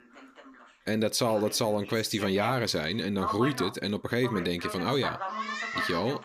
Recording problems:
voice in the background; loud; throughout; 7 dB below the speech

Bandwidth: 15 kHz